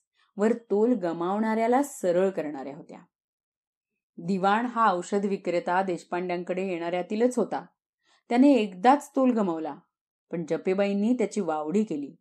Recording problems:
none

